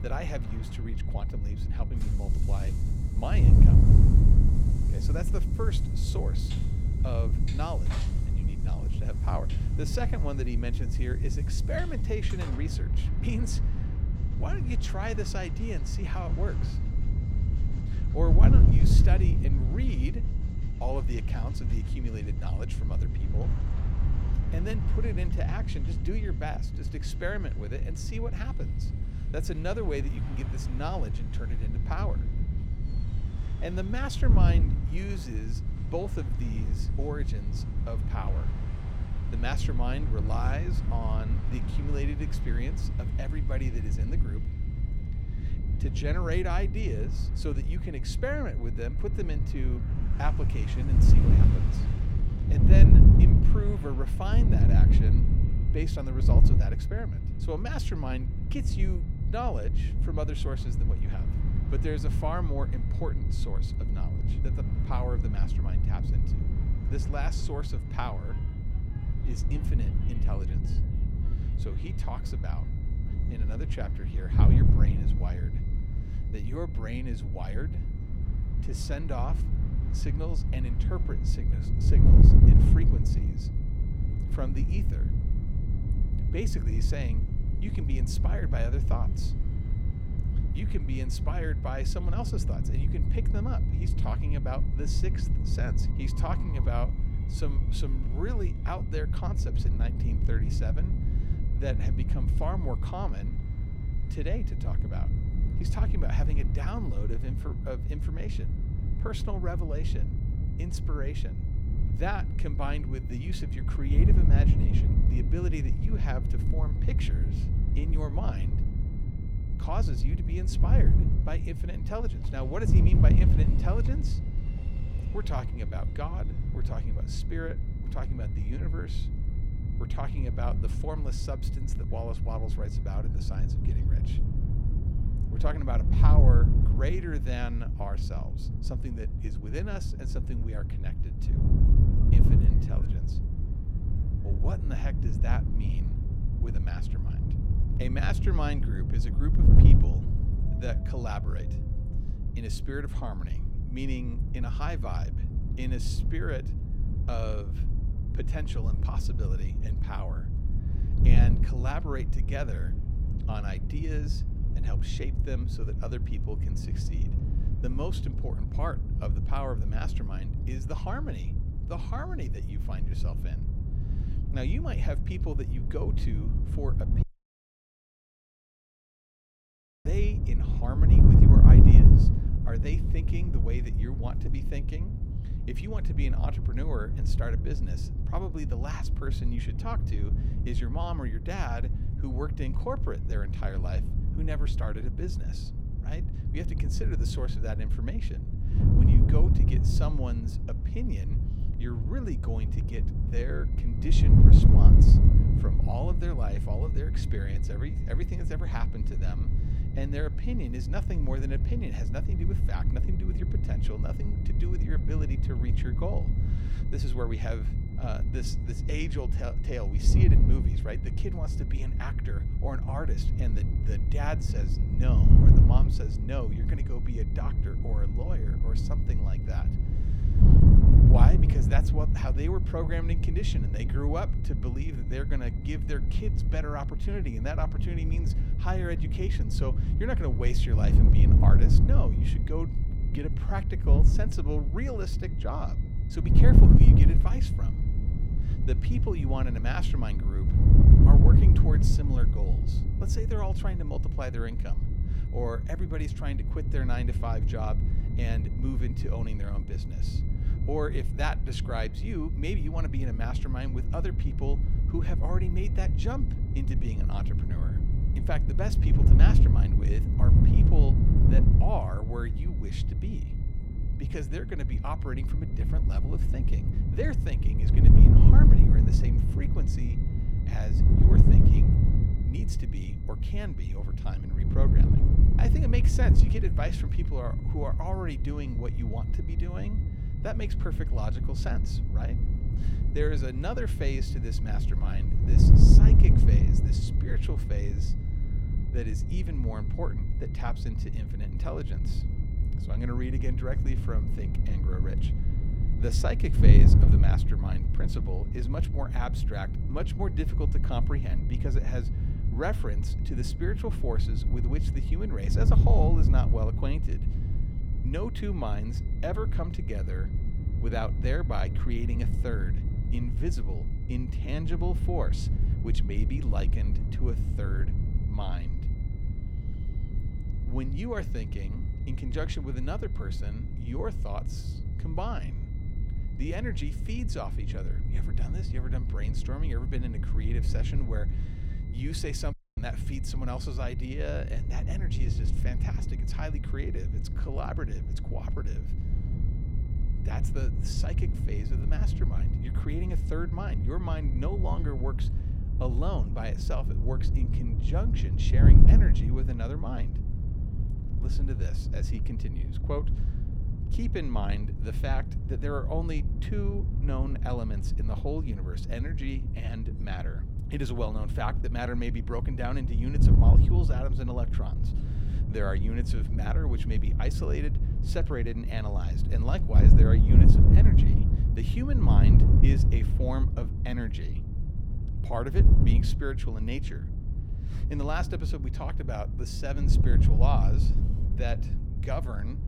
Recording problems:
wind noise on the microphone; heavy; 2 dB below the speech
train or aircraft noise; noticeable; throughout; 20 dB below the speech
high-pitched whine; faint; until 2:13 and from 3:23 to 5:55; 2 kHz, 25 dB below the speech
audio cutting out; at 2:57 for 3 s and at 5:42

